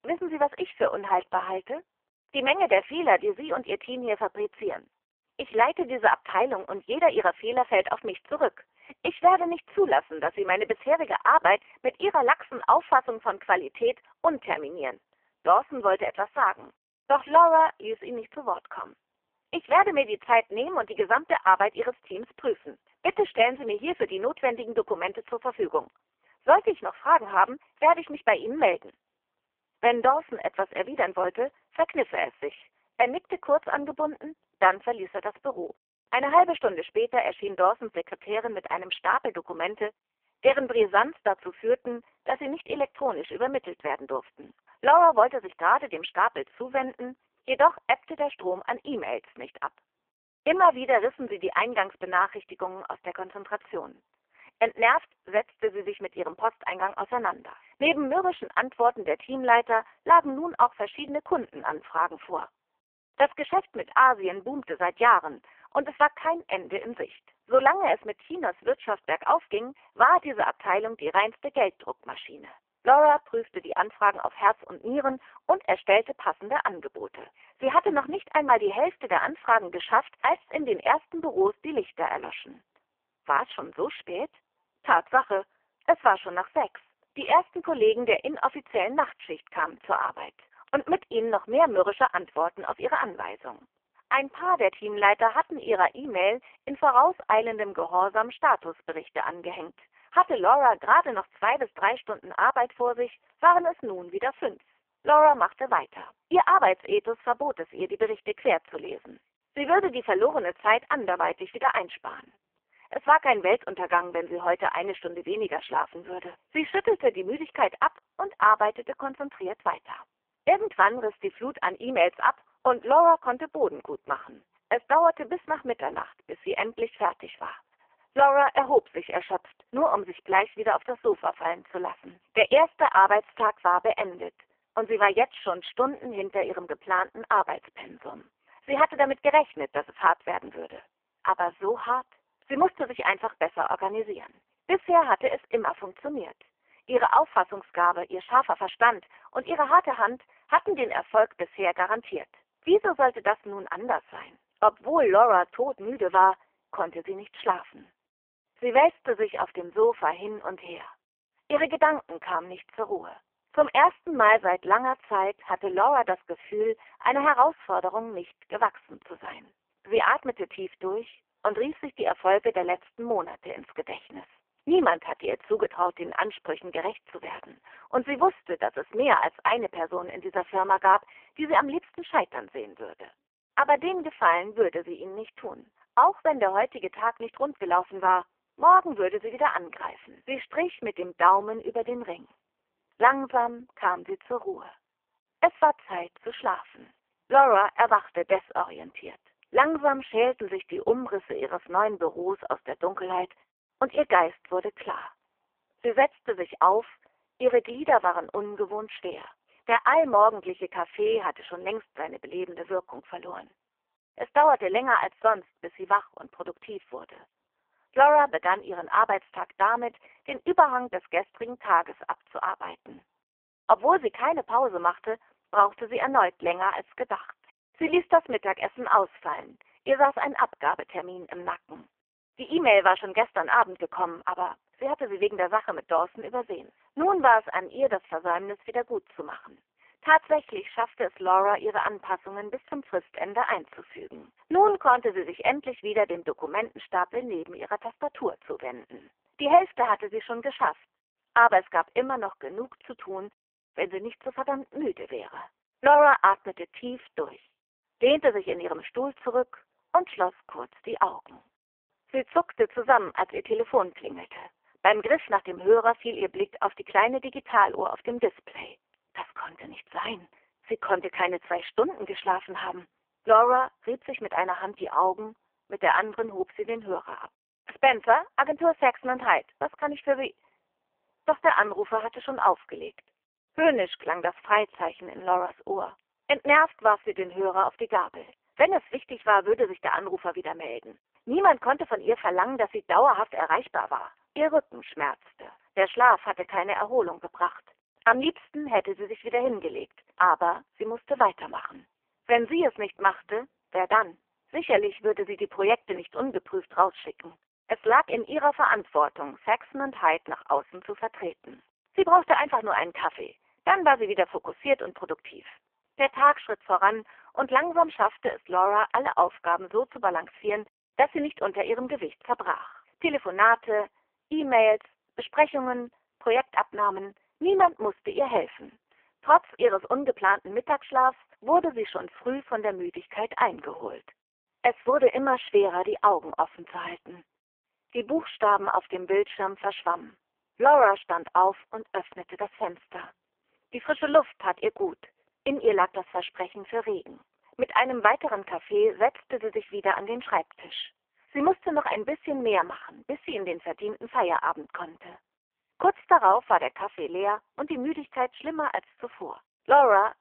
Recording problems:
phone-call audio; poor line; nothing above 3 kHz

